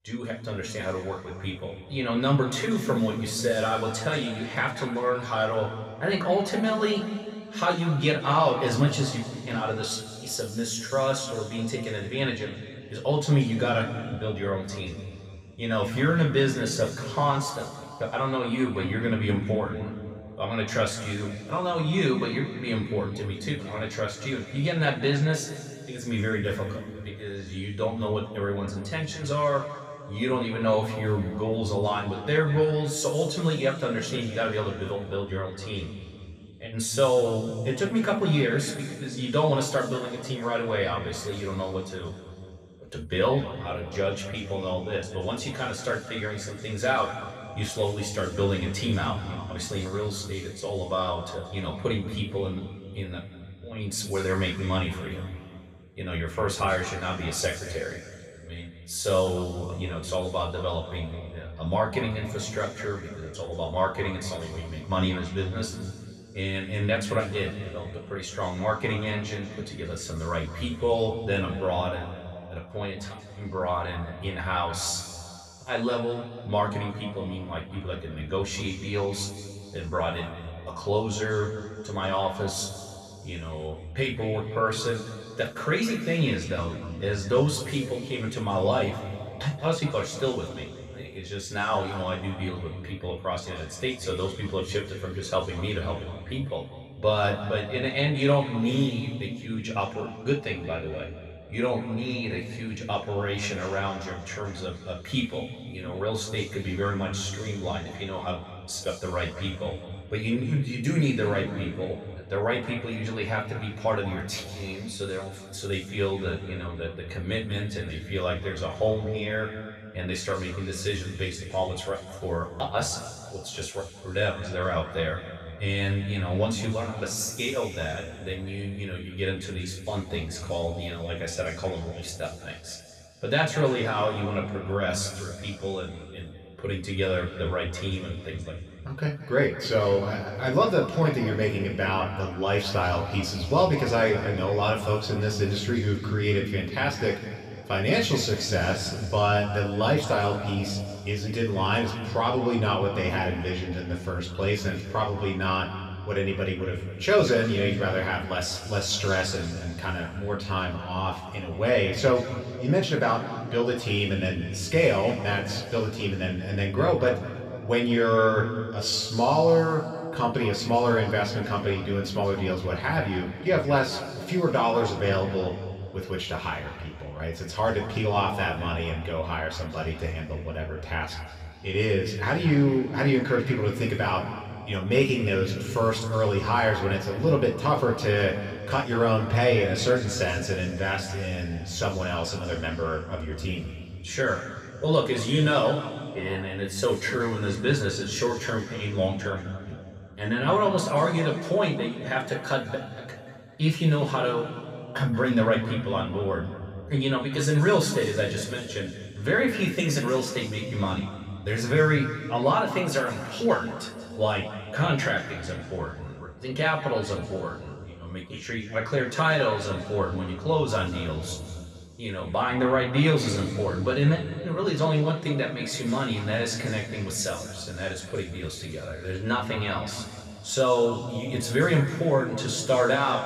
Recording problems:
room echo; noticeable; dies away in 2.2 s
off-mic speech; somewhat distant

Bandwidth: 15.5 kHz